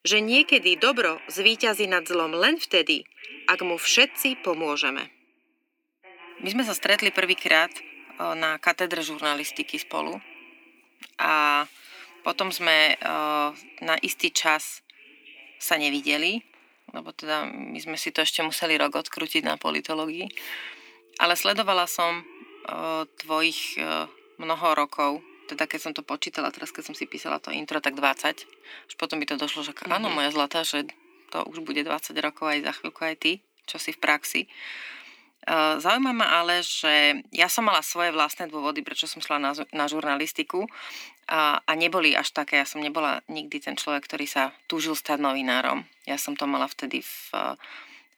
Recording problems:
thin; somewhat; fading below 250 Hz
alarms or sirens; faint; throughout; 20 dB below the speech

